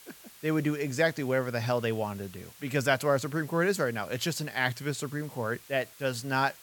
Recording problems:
hiss; faint; throughout; 20 dB below the speech

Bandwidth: 17.5 kHz